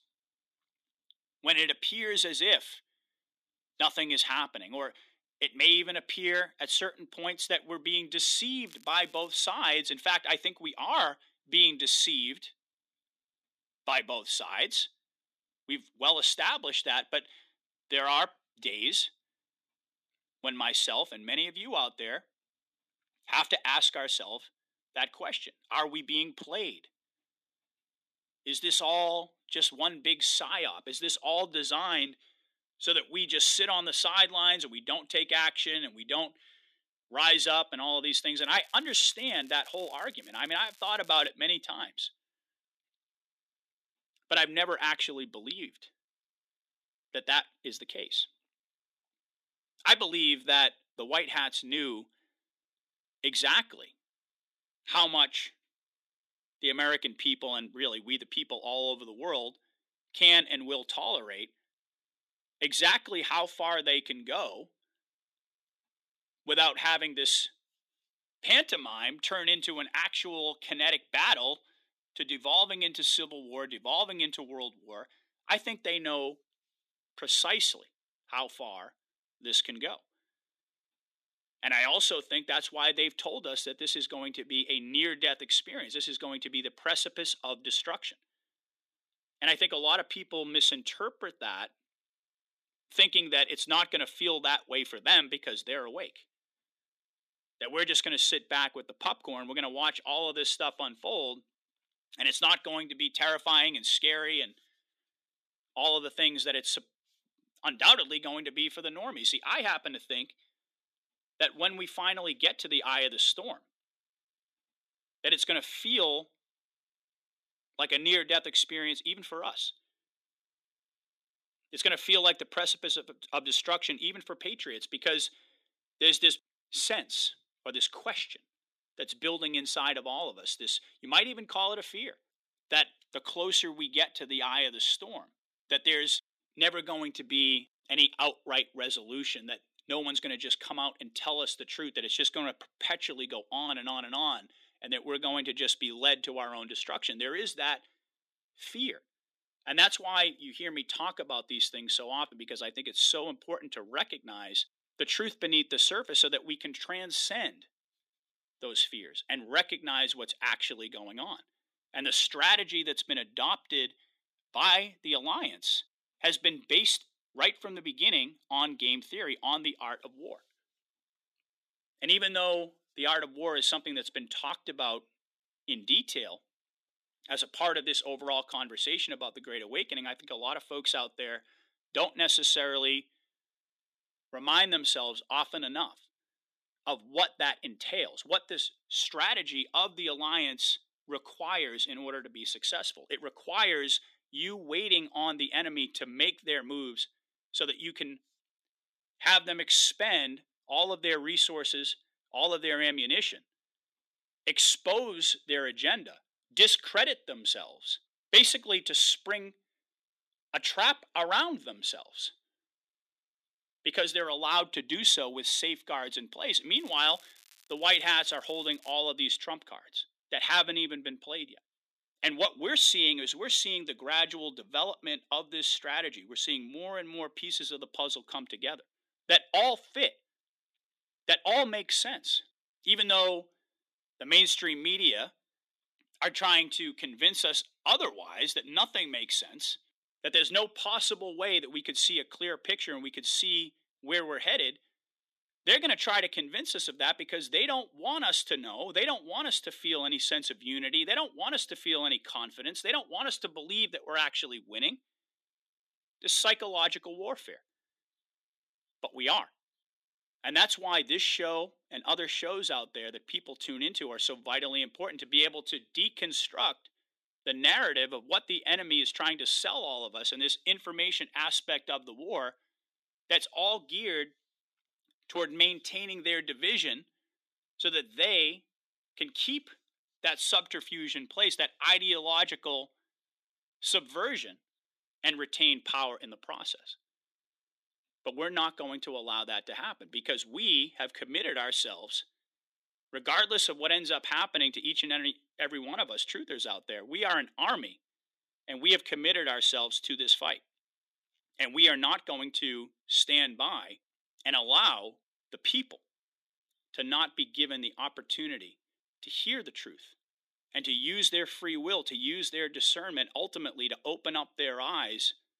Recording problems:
thin; very slightly; fading below 250 Hz
crackling; faint; at 8.5 s, from 38 to 41 s and from 3:37 to 3:39; 30 dB below the speech

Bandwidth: 14.5 kHz